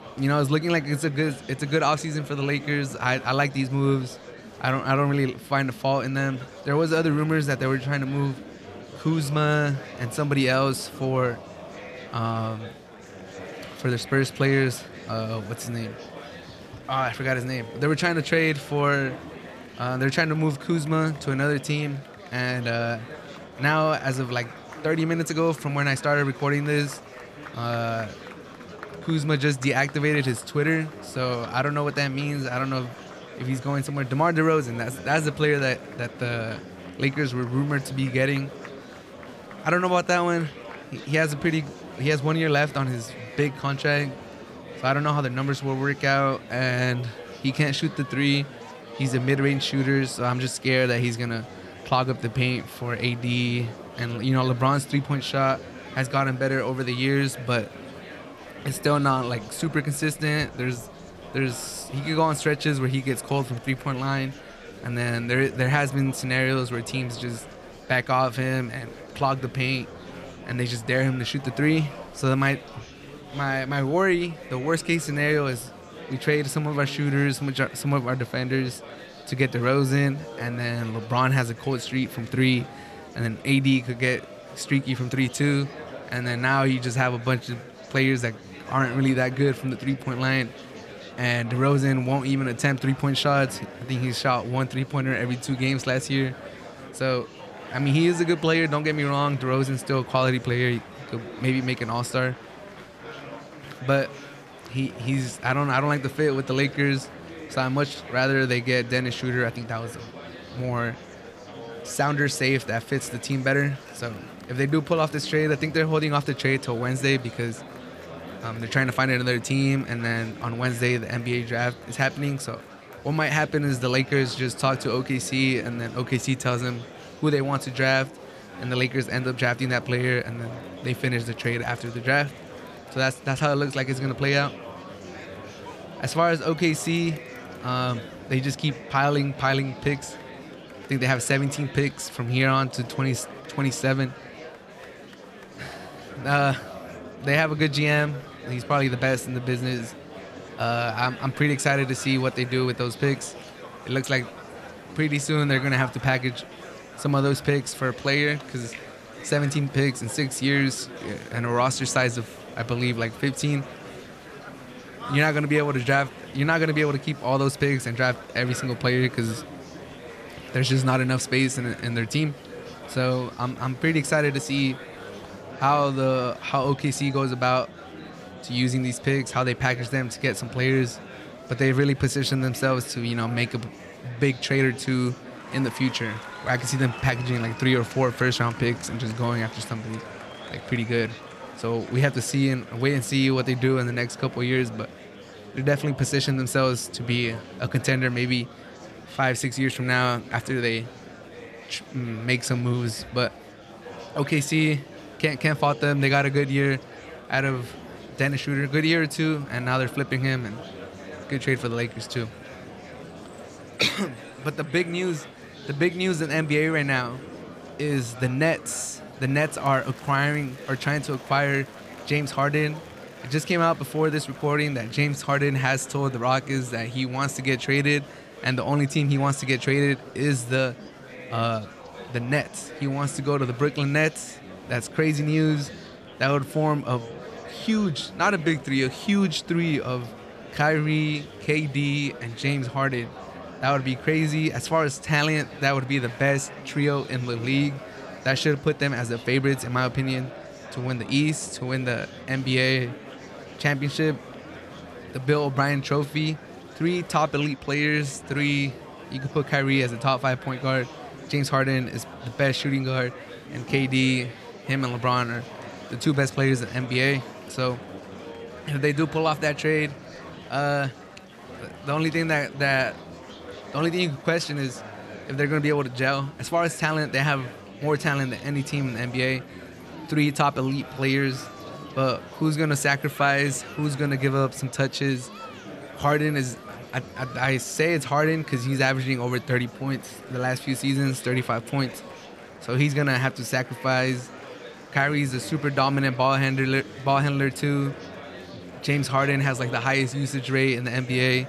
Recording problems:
murmuring crowd; noticeable; throughout; 15 dB below the speech

